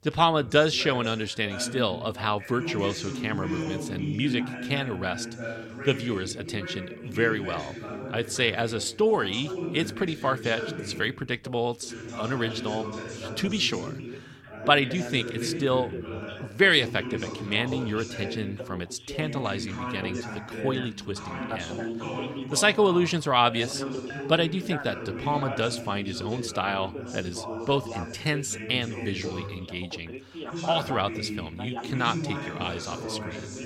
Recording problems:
background chatter; loud; throughout; 2 voices, 8 dB below the speech

